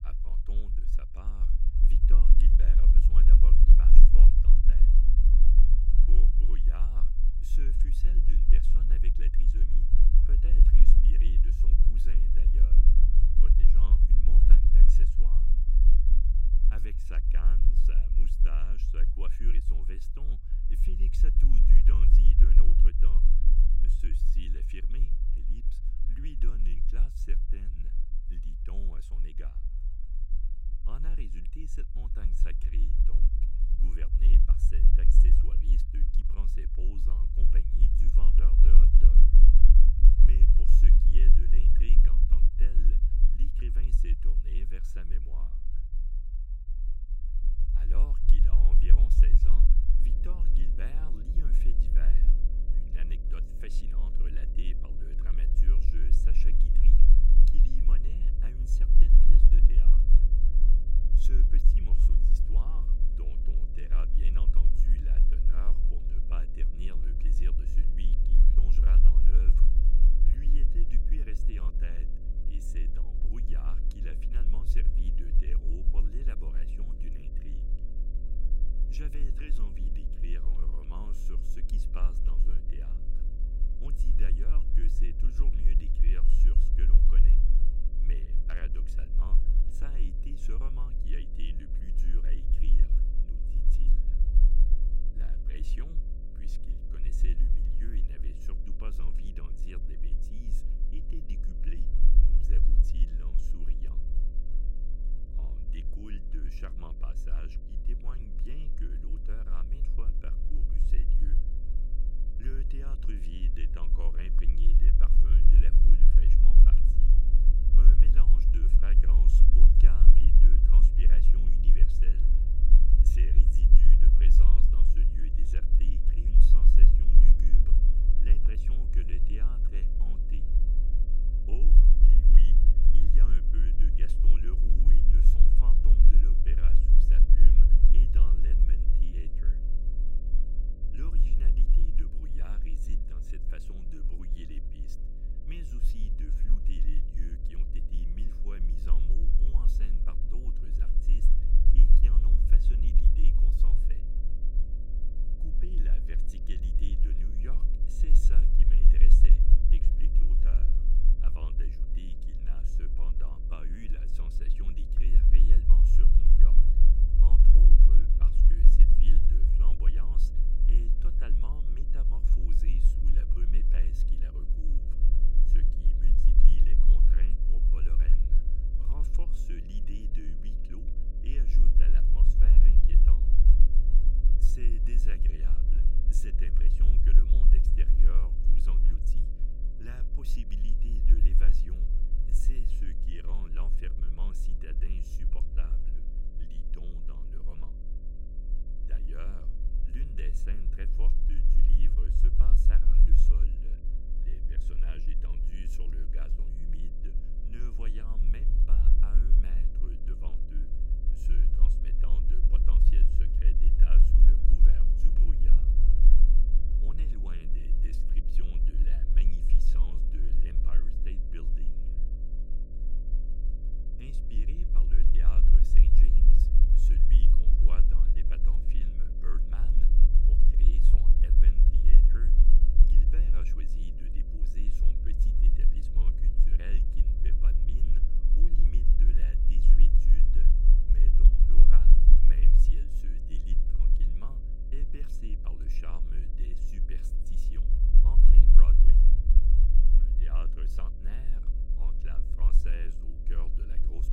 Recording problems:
electrical hum; loud; from 50 s on; 50 Hz, 7 dB below the speech
low rumble; loud; throughout; 1 dB below the speech

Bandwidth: 16 kHz